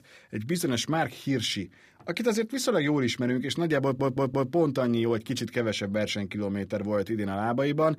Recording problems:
audio stuttering; at 4 s

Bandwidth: 15 kHz